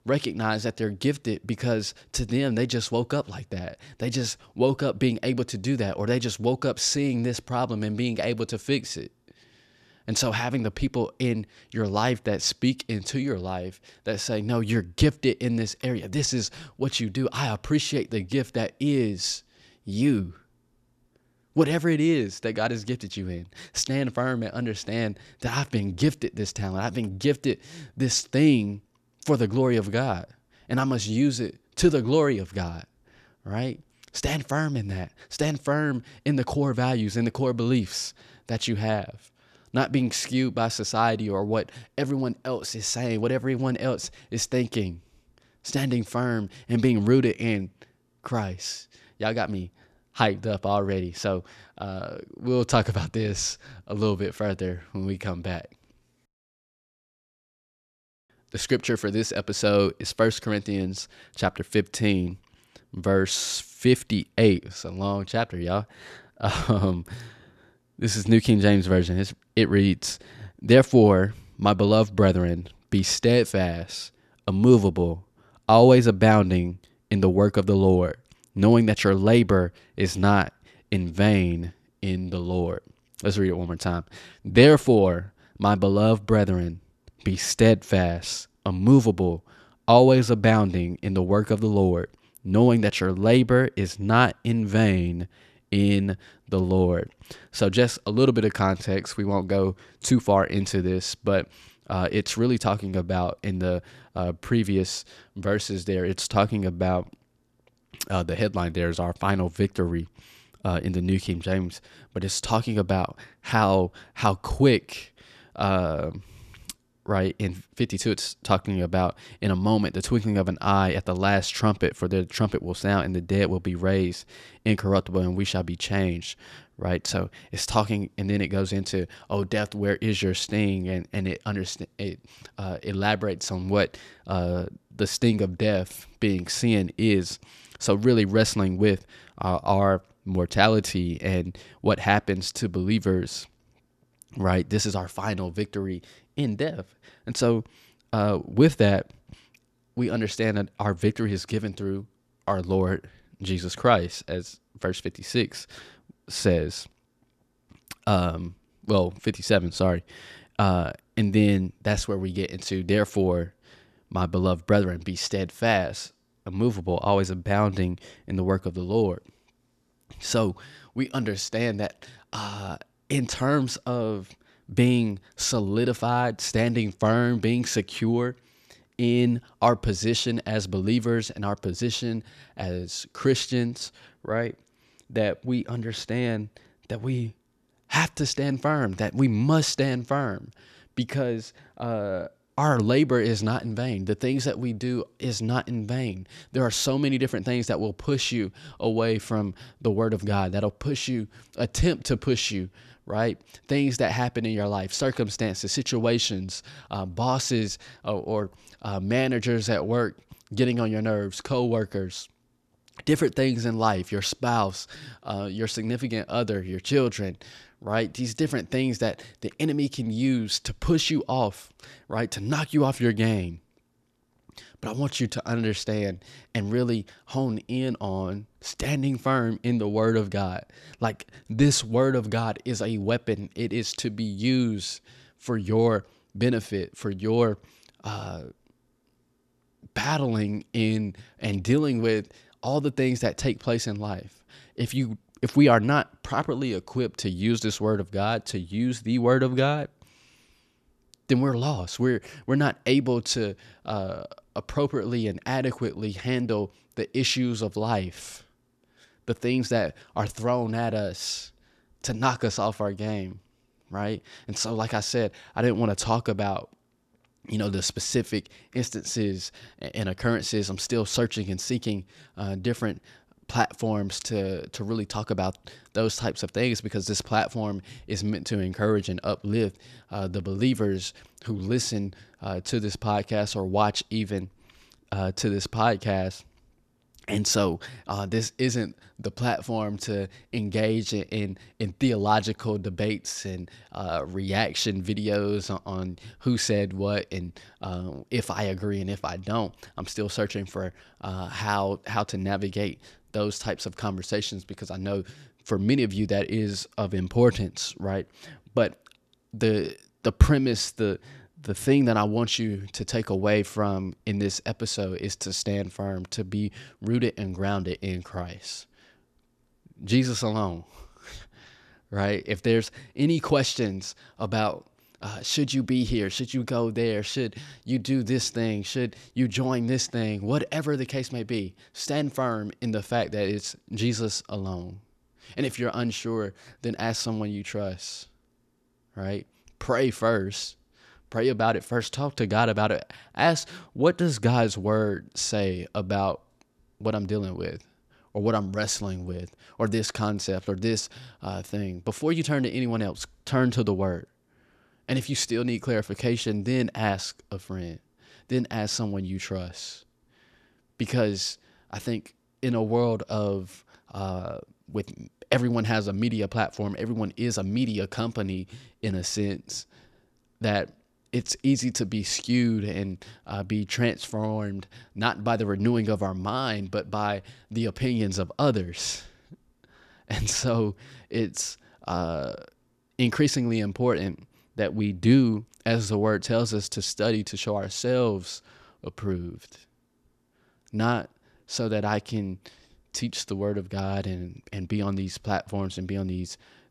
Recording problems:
none

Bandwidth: 13.5 kHz